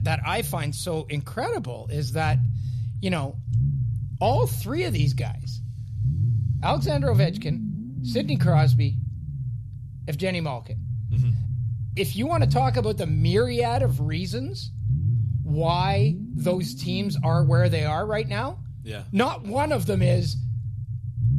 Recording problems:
low rumble; noticeable; throughout; 10 dB below the speech

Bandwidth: 13.5 kHz